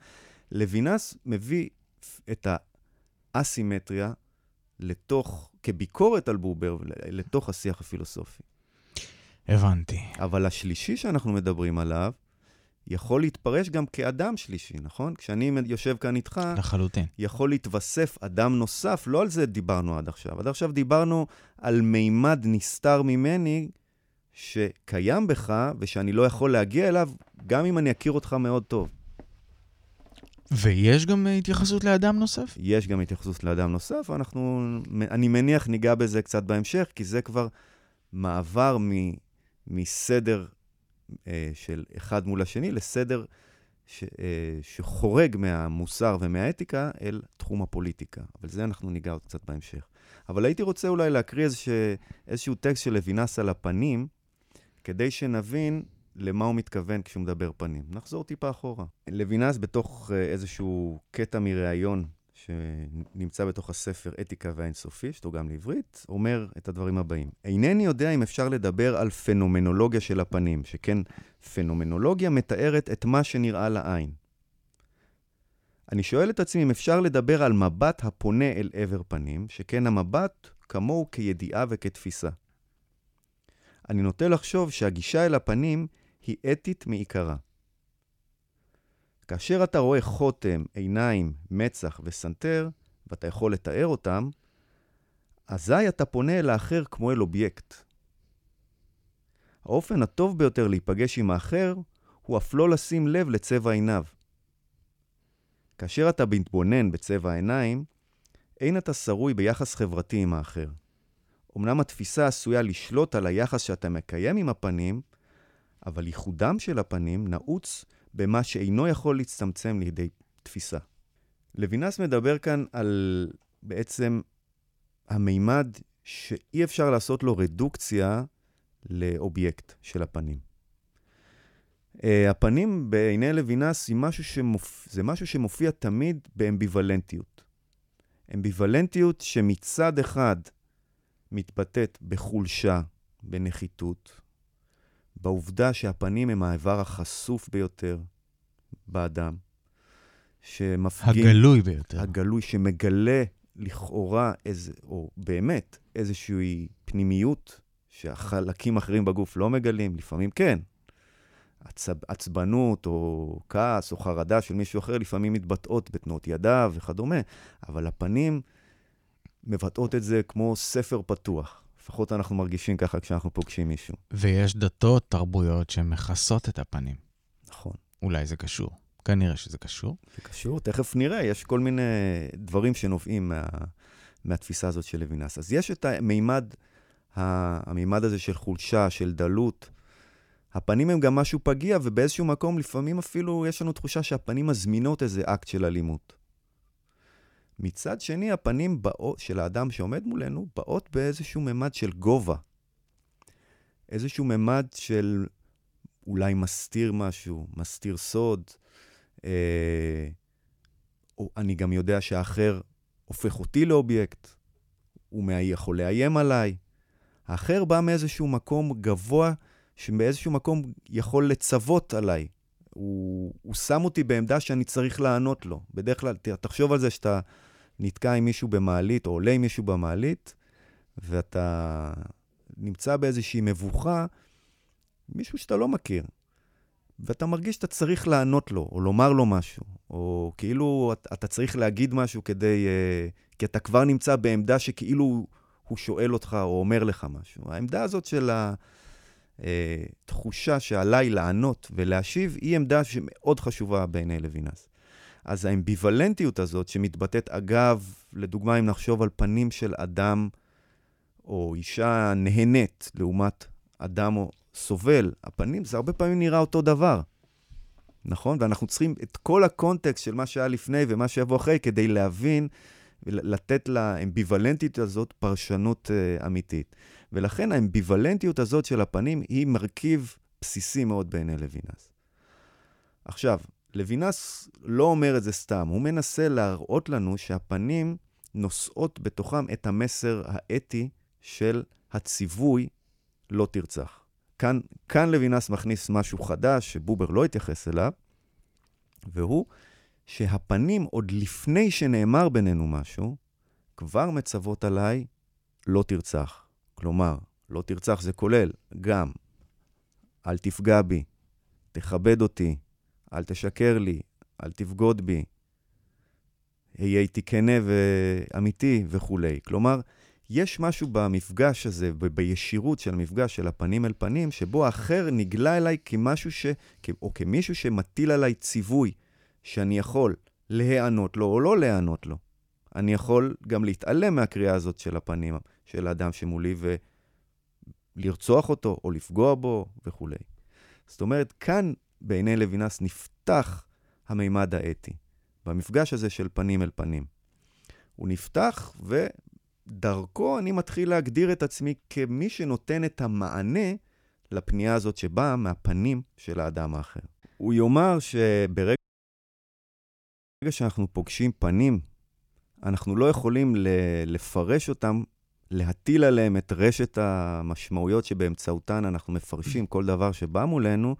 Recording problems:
audio cutting out; at 5:59 for 1.5 s

